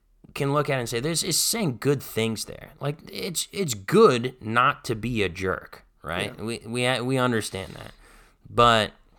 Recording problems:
none

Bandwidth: 18.5 kHz